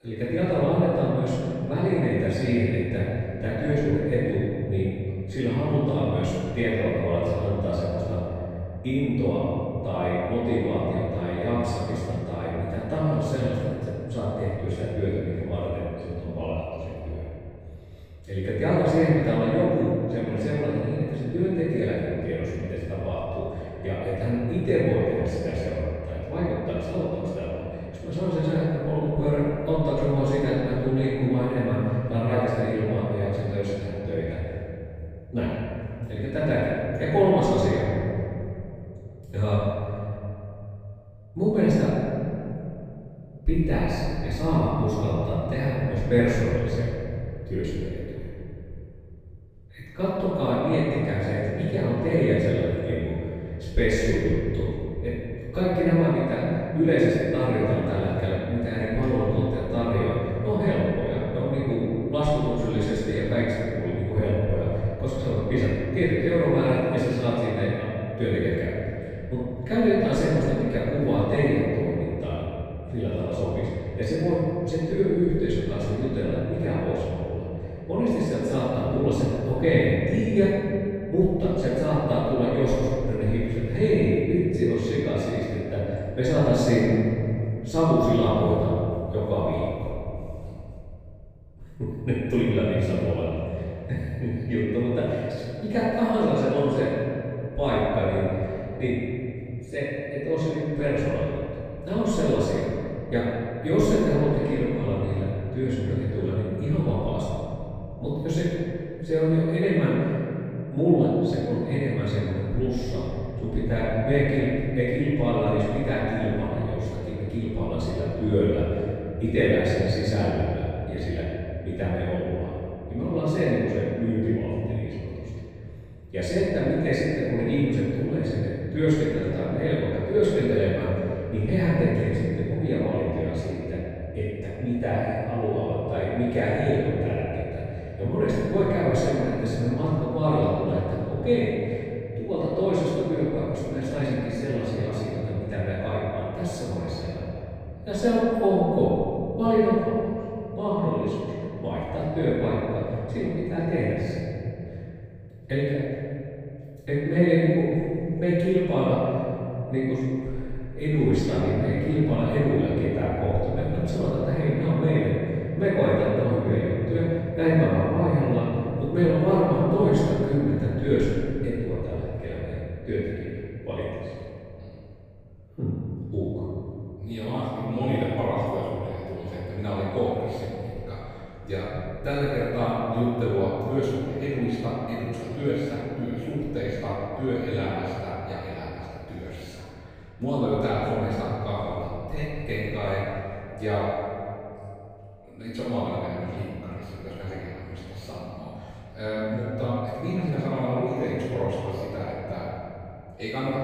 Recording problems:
room echo; strong; dies away in 3 s
off-mic speech; far

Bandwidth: 15.5 kHz